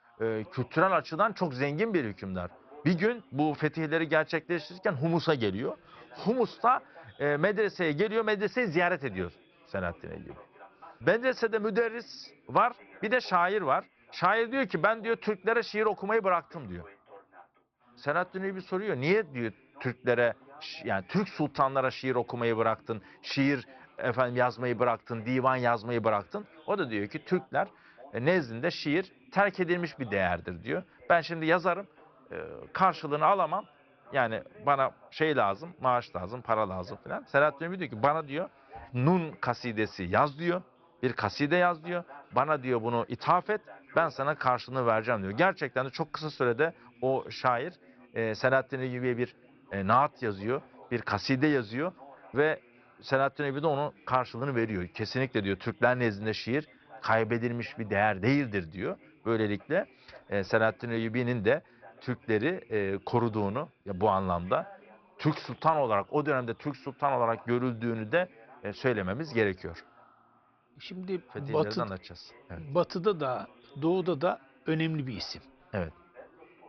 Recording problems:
high frequencies cut off; noticeable; nothing above 5.5 kHz
background chatter; faint; throughout; 2 voices, 25 dB below the speech

